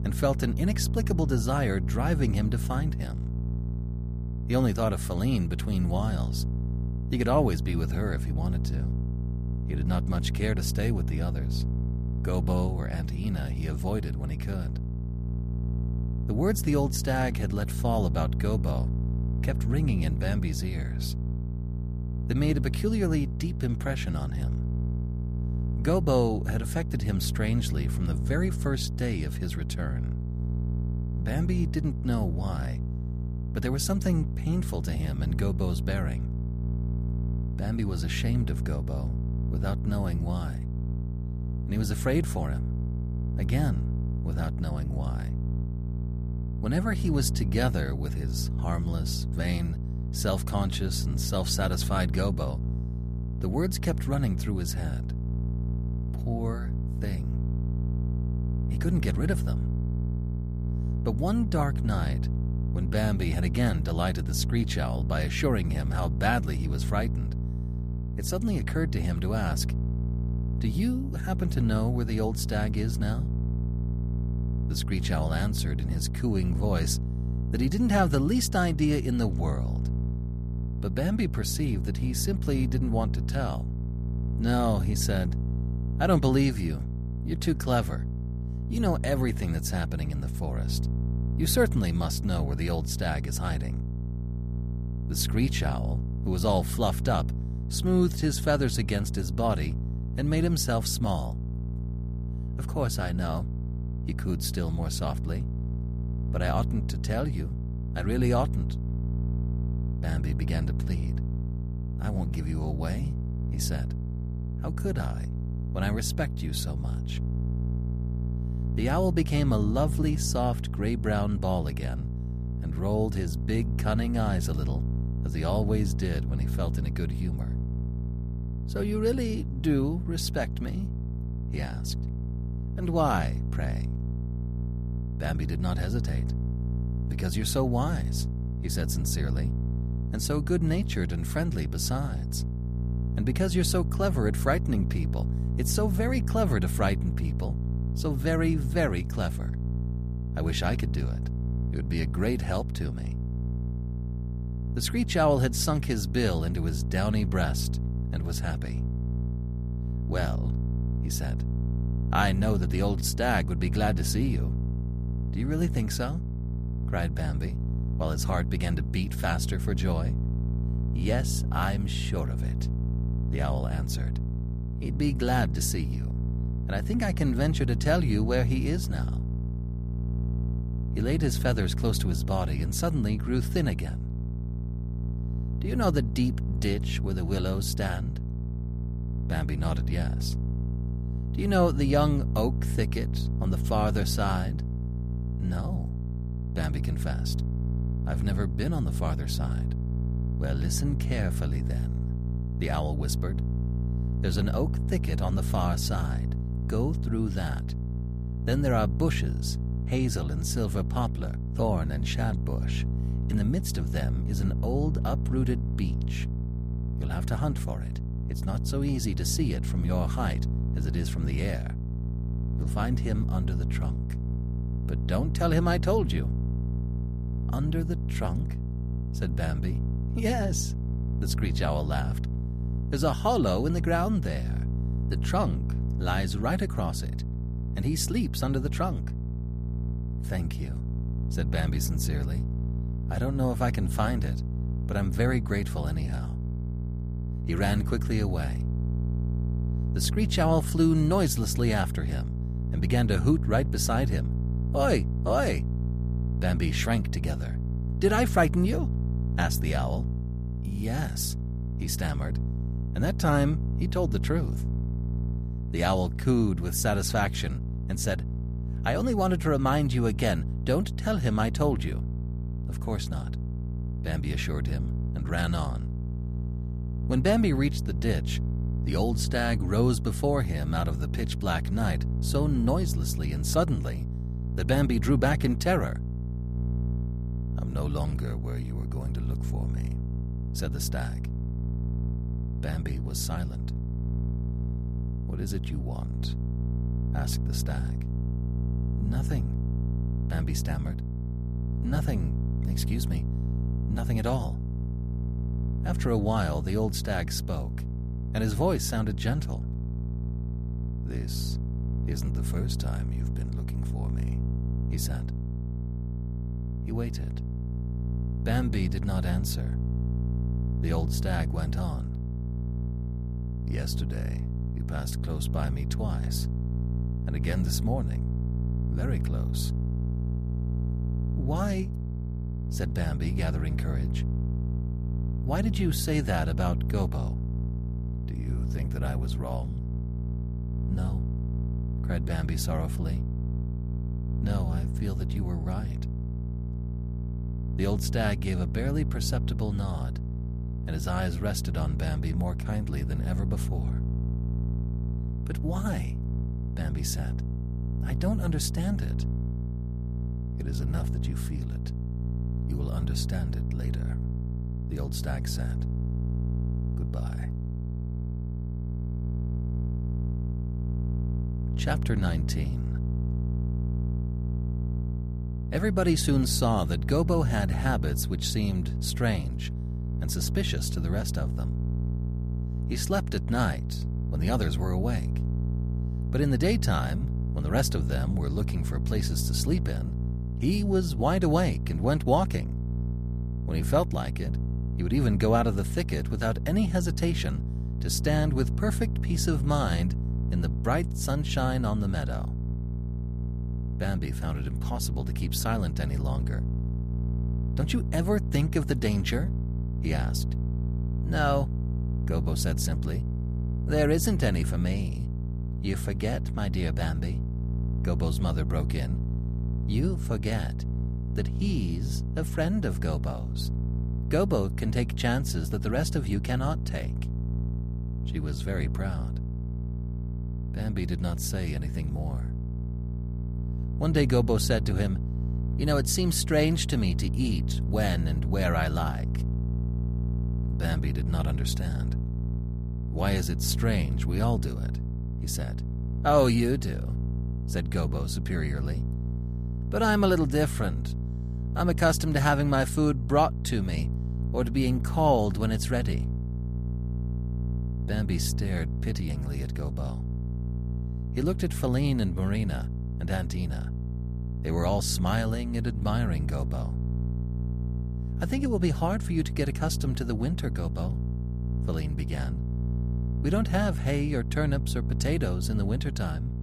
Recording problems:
electrical hum; noticeable; throughout; 60 Hz, 10 dB below the speech

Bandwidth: 14.5 kHz